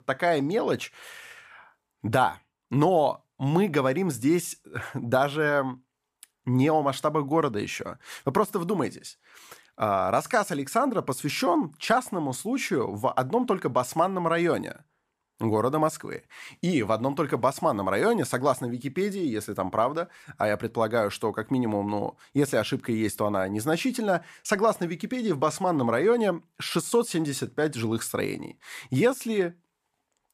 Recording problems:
none

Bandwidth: 14.5 kHz